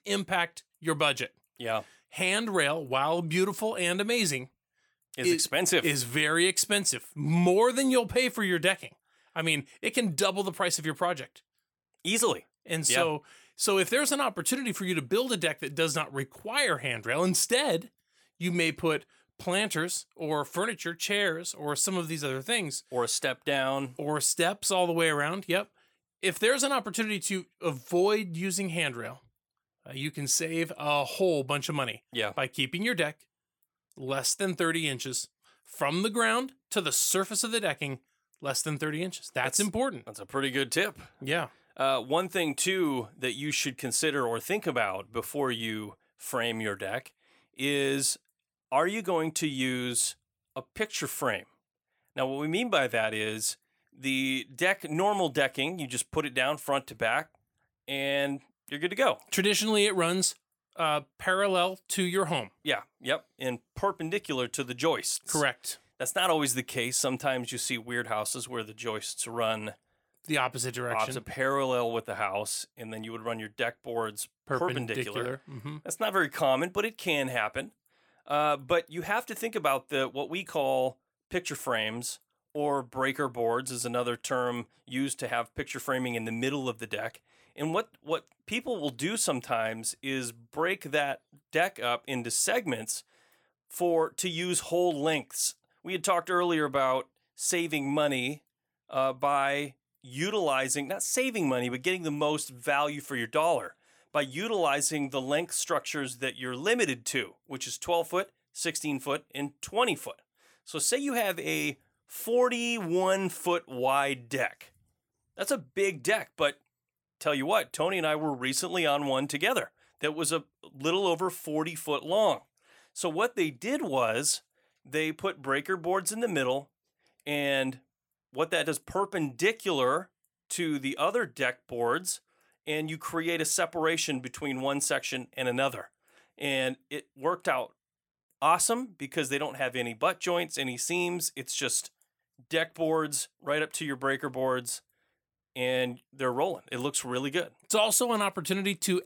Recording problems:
none

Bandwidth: 19 kHz